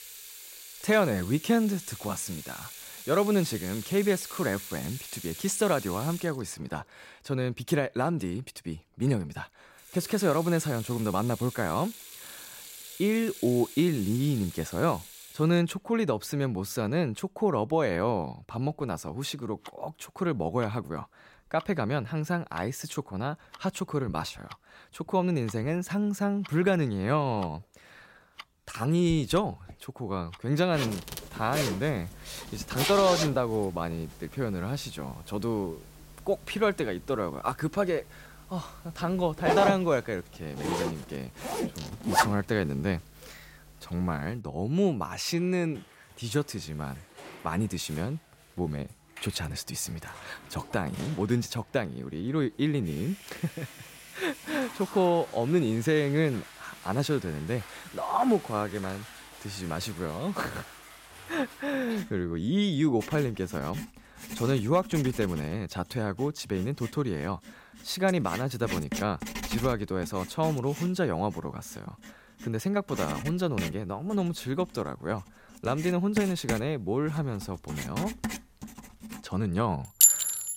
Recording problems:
household noises; loud; throughout; 5 dB below the speech

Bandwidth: 16 kHz